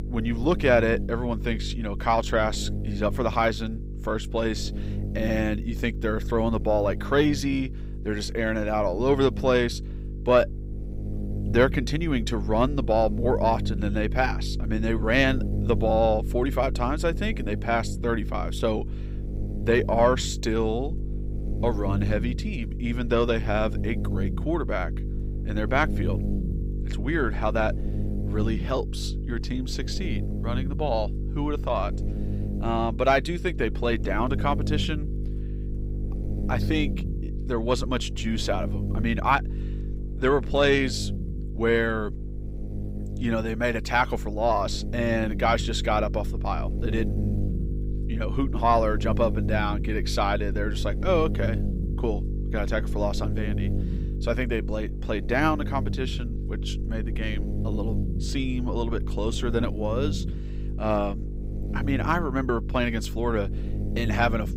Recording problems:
electrical hum; noticeable; throughout; 50 Hz, 15 dB below the speech

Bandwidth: 15.5 kHz